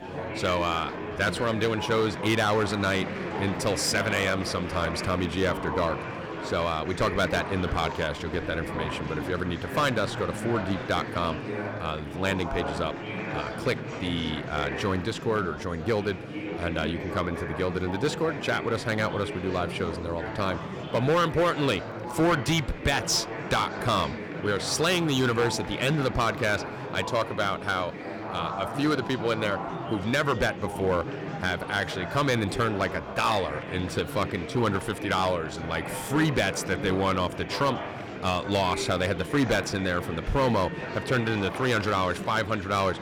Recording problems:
distortion; slight; 4% of the sound clipped
murmuring crowd; loud; throughout; 7 dB below the speech

